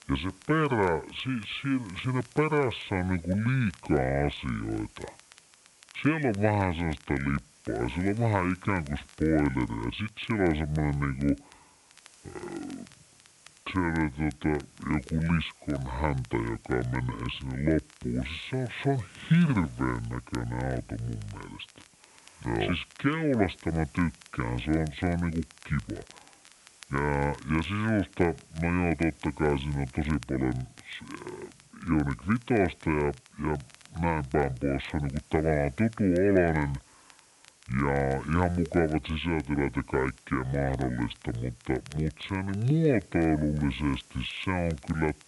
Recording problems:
high frequencies cut off; severe; nothing above 4 kHz
wrong speed and pitch; too slow and too low; 0.6 times normal speed
hiss; faint; throughout; 25 dB below the speech
crackle, like an old record; faint; 25 dB below the speech

